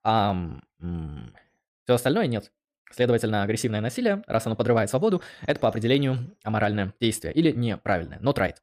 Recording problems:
none

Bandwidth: 15 kHz